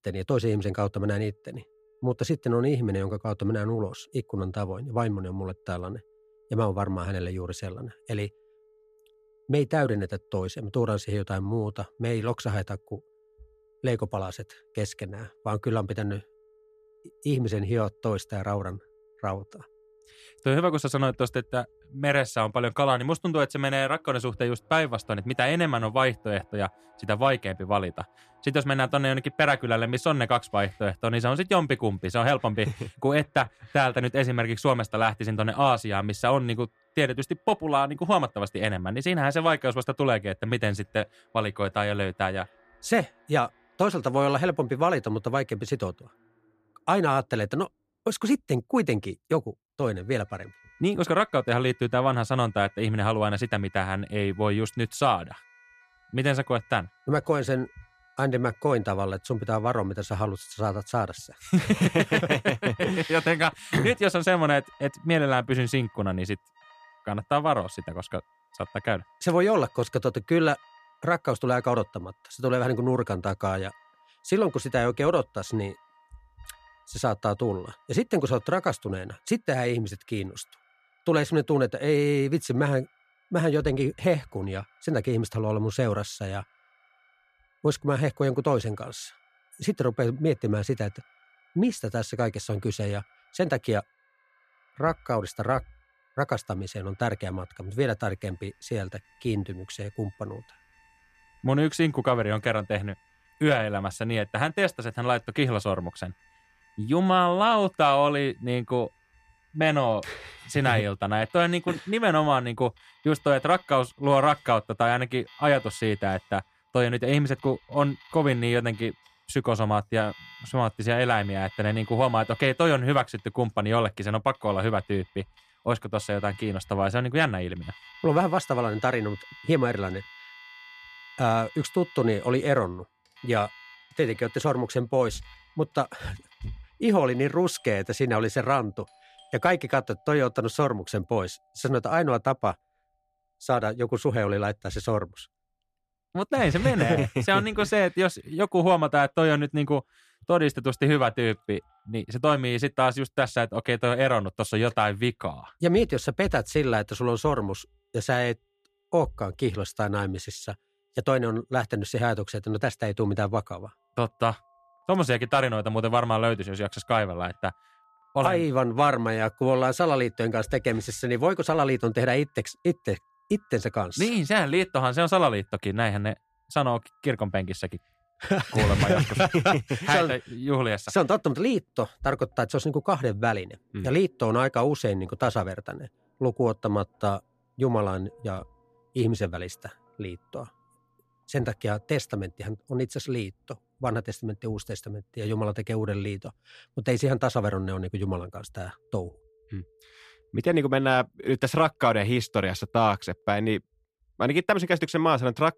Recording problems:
alarms or sirens; faint; throughout; 30 dB below the speech

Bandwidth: 14.5 kHz